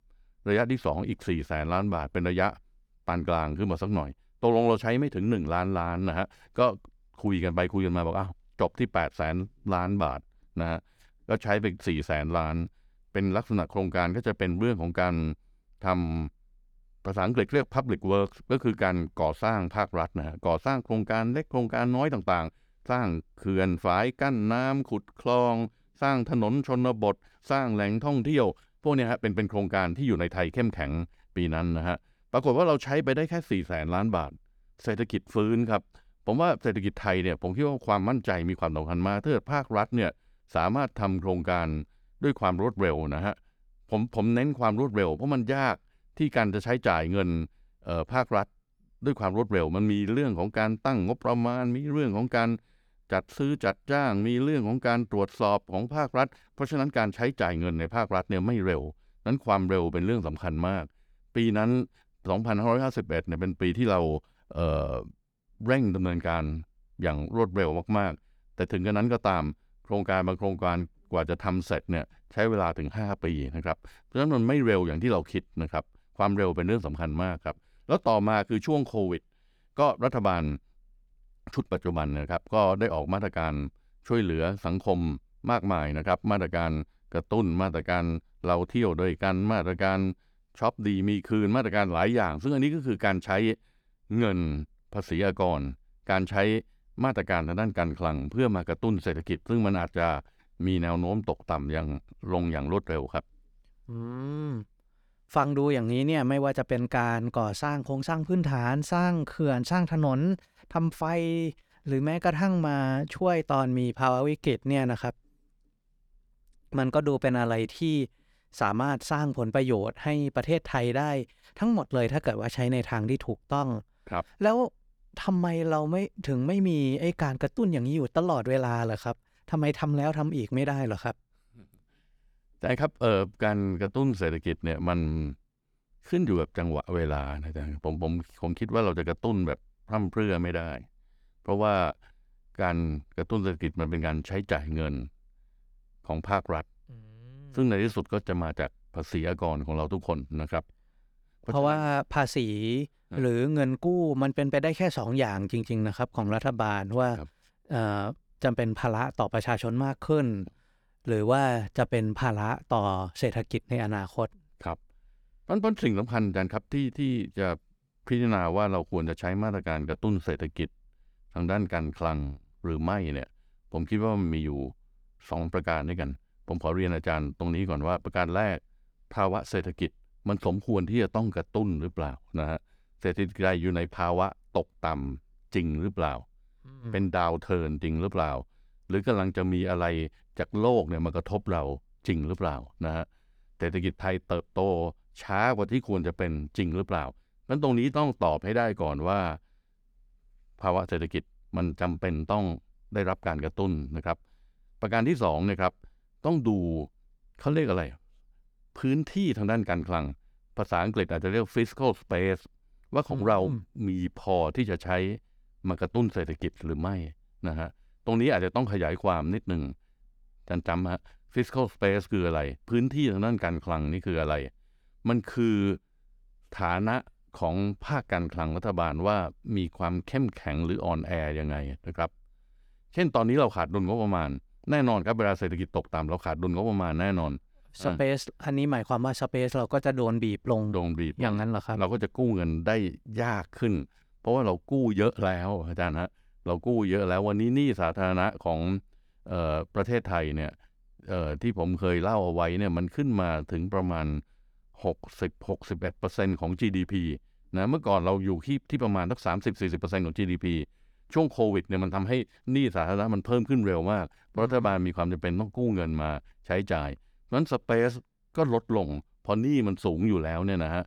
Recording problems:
none

